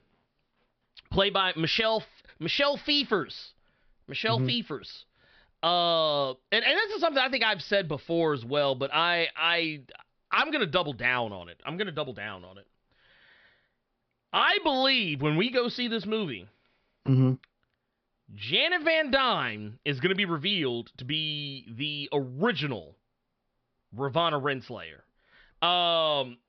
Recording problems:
high frequencies cut off; noticeable; nothing above 5.5 kHz

